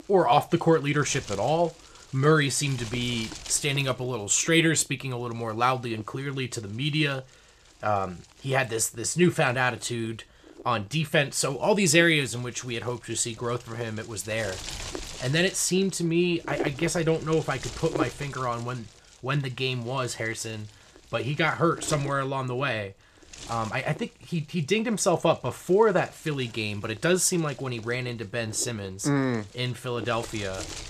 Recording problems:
wind noise on the microphone; occasional gusts; 15 dB below the speech

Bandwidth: 14.5 kHz